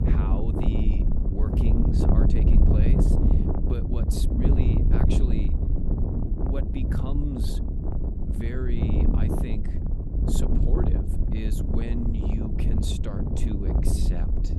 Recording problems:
wind noise on the microphone; heavy; 4 dB above the speech

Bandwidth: 15.5 kHz